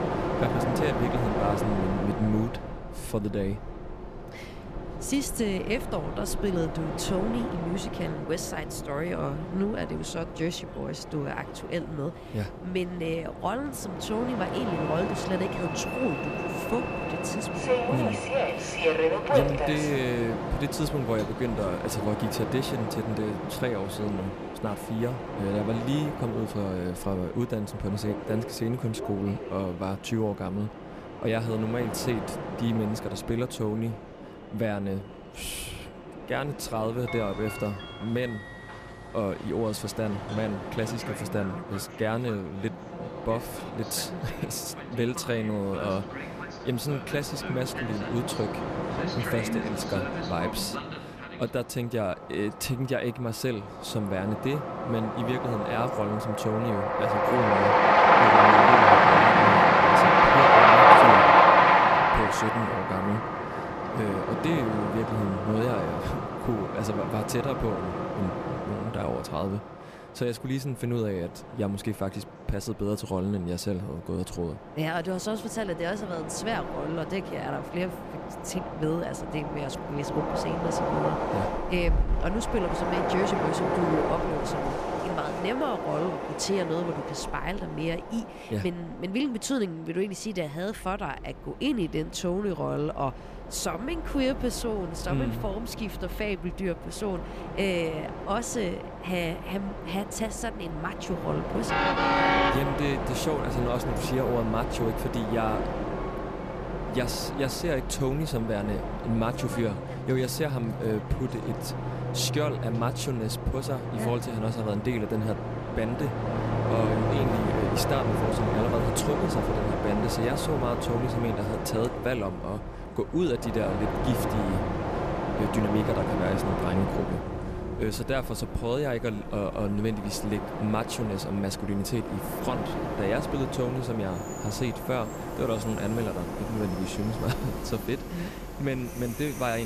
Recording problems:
train or aircraft noise; very loud; throughout; 4 dB above the speech
background chatter; faint; throughout; 4 voices, 25 dB below the speech
abrupt cut into speech; at the end

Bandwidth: 14.5 kHz